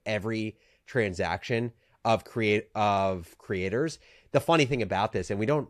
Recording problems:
none

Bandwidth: 14 kHz